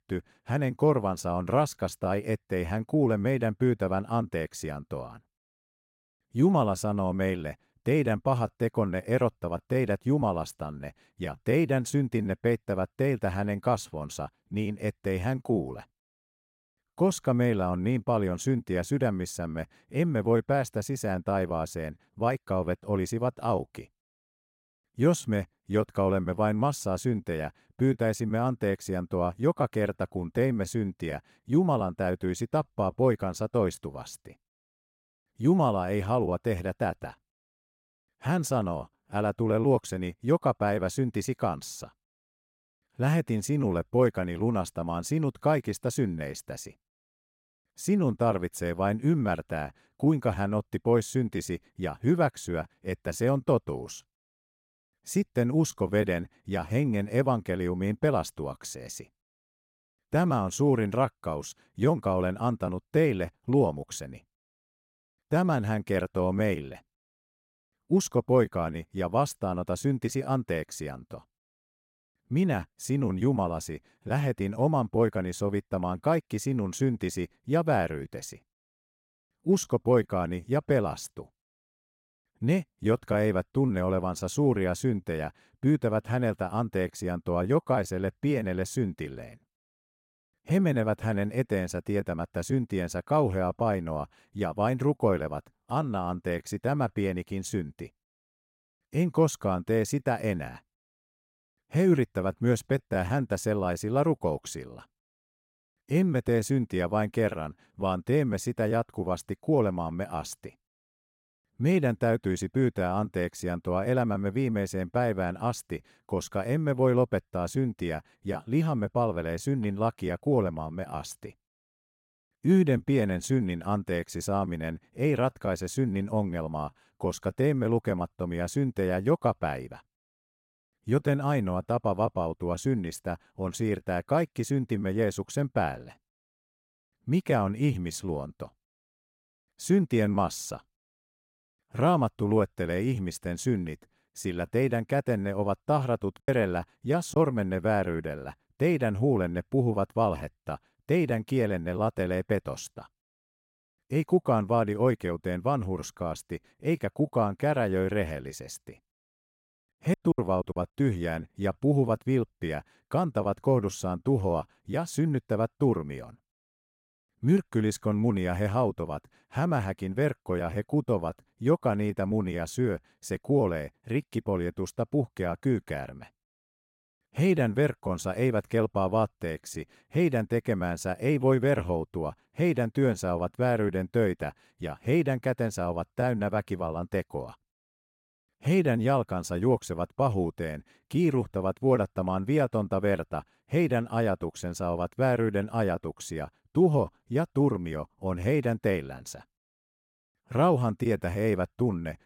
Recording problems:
choppy; very; at 2:26 and at 2:40; 17% of the speech affected

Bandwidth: 16 kHz